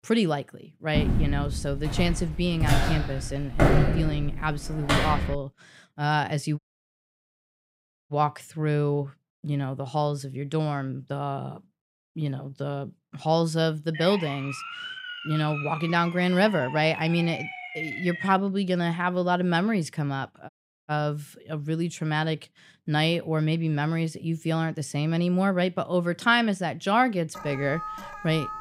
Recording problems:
footsteps; loud; from 1 to 5.5 s; peak 6 dB above the speech
audio cutting out; at 6.5 s for 1.5 s and at 20 s
siren; noticeable; from 14 to 18 s; peak 6 dB below the speech
alarm; noticeable; from 27 s on; peak 9 dB below the speech

